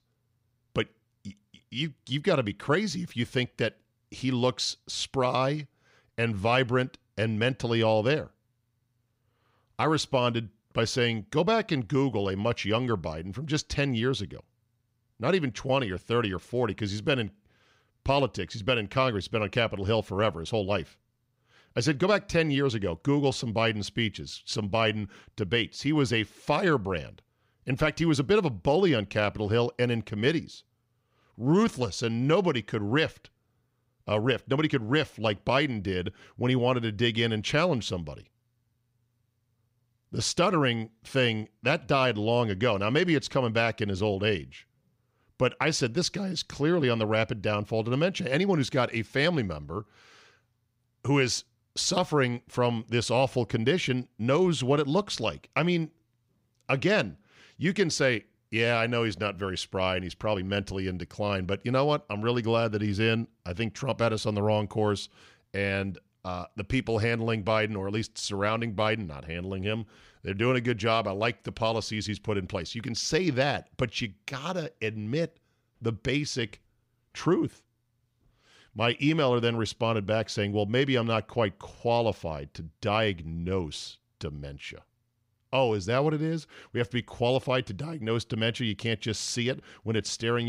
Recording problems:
abrupt cut into speech; at the end

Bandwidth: 15.5 kHz